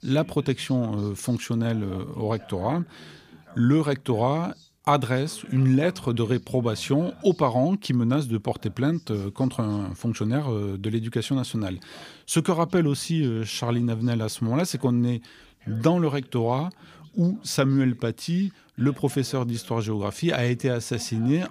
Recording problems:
voice in the background; faint; throughout; 25 dB below the speech

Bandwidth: 15 kHz